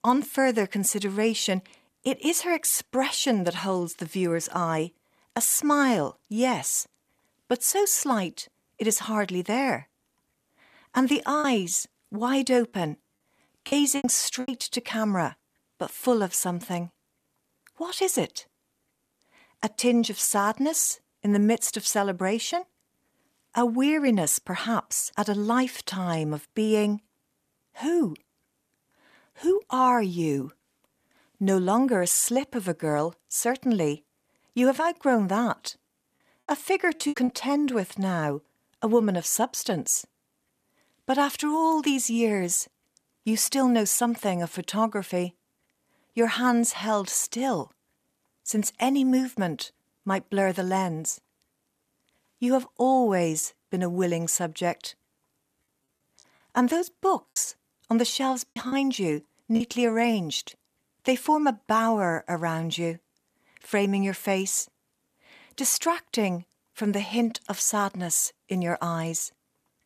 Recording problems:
choppy; very; from 11 to 14 s, at 37 s and from 57 s to 1:00; 9% of the speech affected

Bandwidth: 14.5 kHz